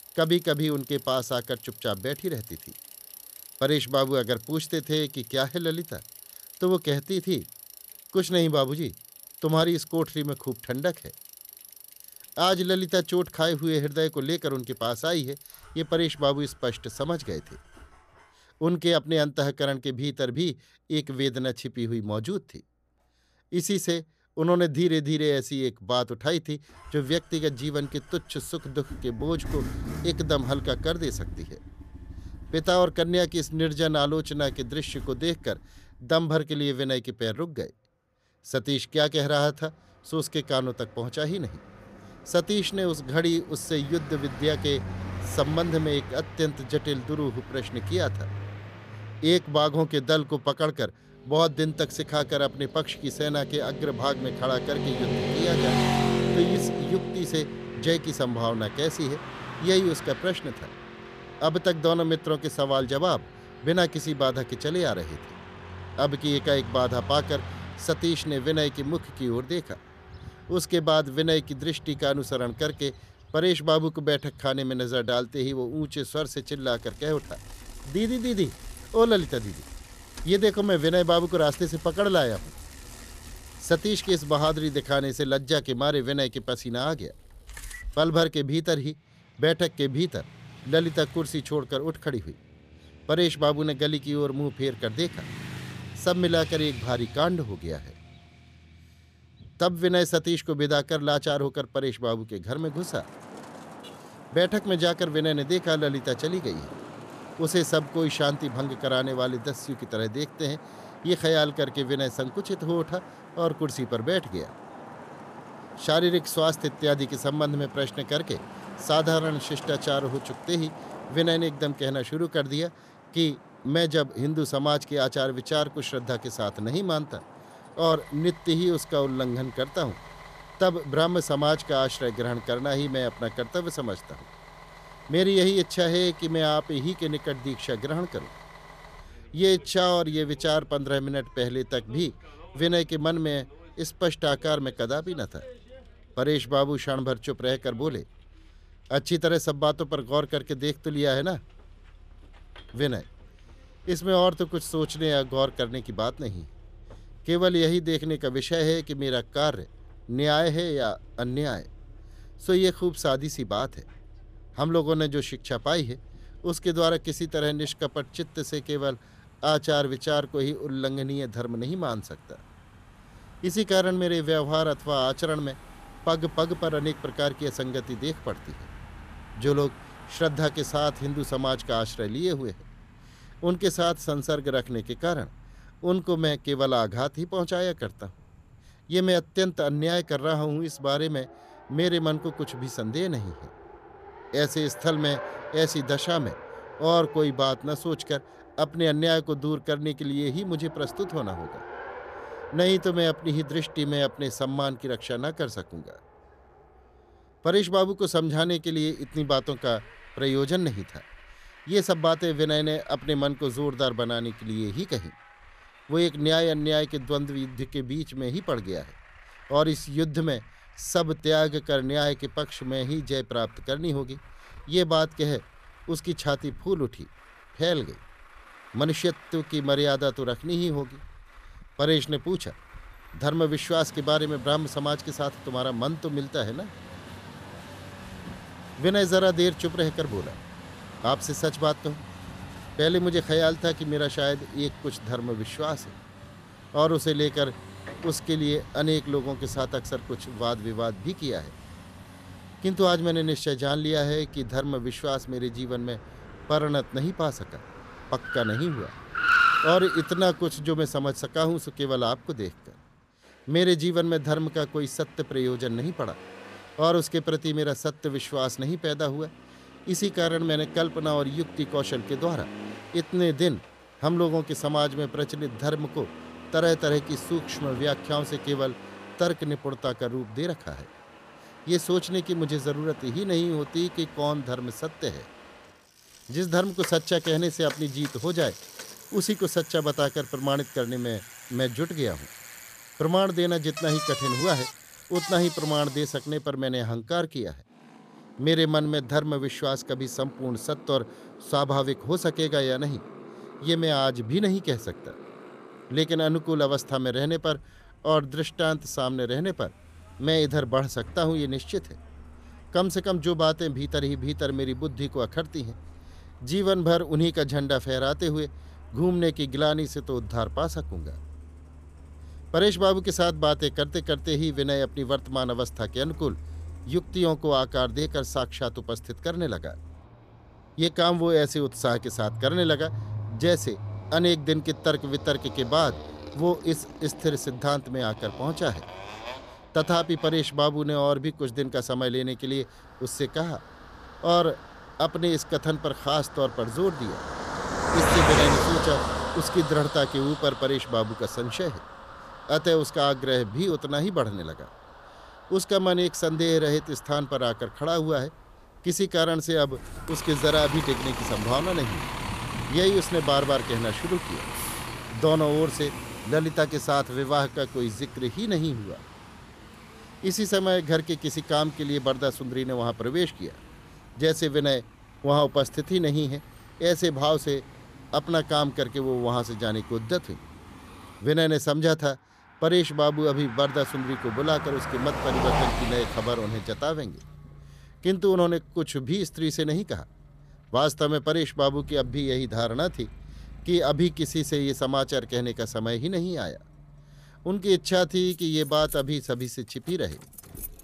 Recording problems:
traffic noise; noticeable; throughout; 10 dB below the speech

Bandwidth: 14.5 kHz